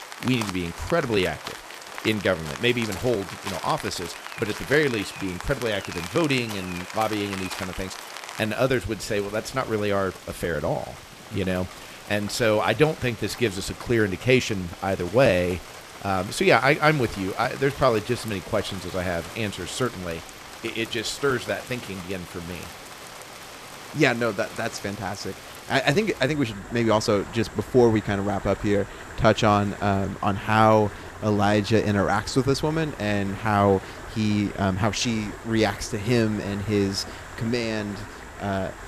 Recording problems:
rain or running water; noticeable; throughout; 15 dB below the speech

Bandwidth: 14.5 kHz